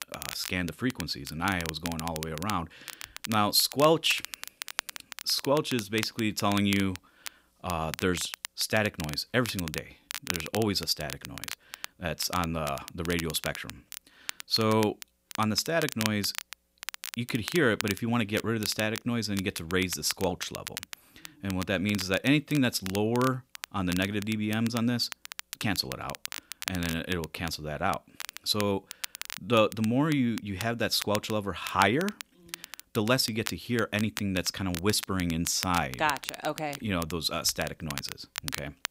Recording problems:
crackle, like an old record; noticeable; 10 dB below the speech

